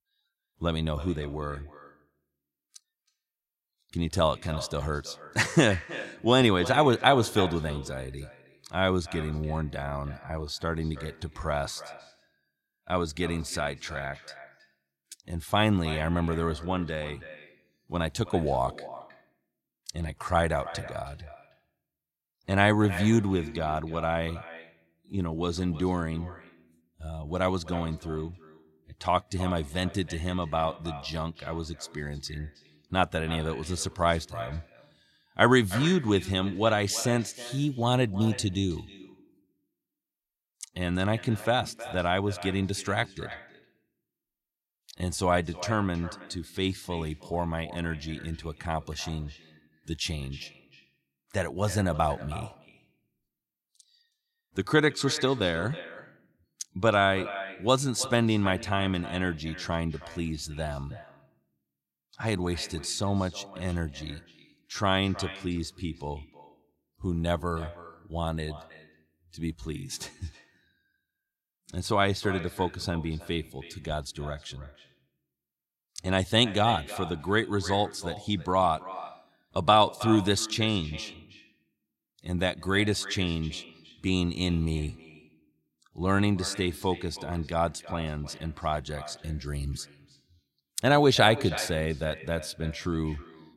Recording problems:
echo of what is said; noticeable; throughout; 320 ms later, 15 dB below the speech

